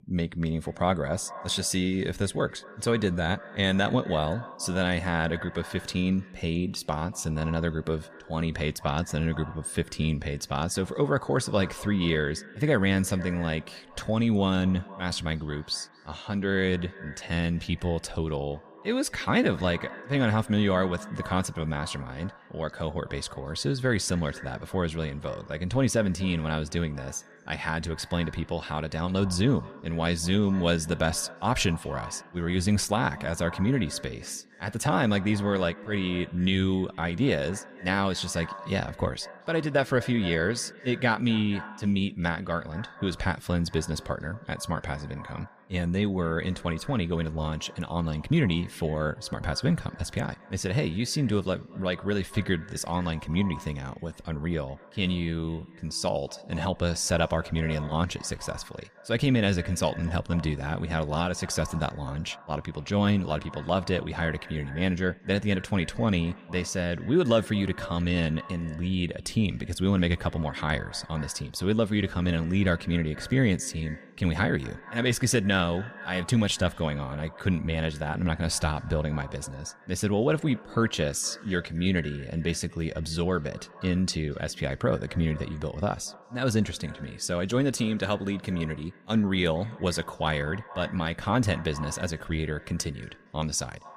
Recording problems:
echo of what is said; faint; throughout; 230 ms later, 20 dB below the speech

